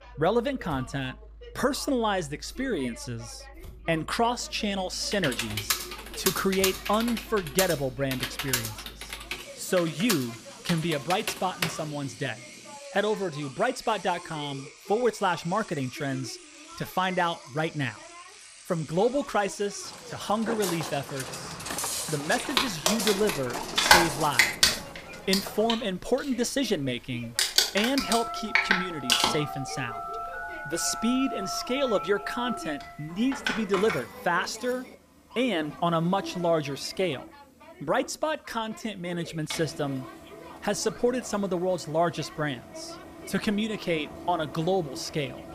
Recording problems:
household noises; very loud; throughout; 3 dB above the speech
voice in the background; noticeable; throughout; 20 dB below the speech
traffic noise; faint; throughout; 25 dB below the speech
keyboard typing; loud; from 5 to 12 s; peak 1 dB above the speech
footsteps; loud; from 20 to 26 s; peak level with the speech
phone ringing; noticeable; from 28 to 35 s; peak 5 dB below the speech

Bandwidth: 14.5 kHz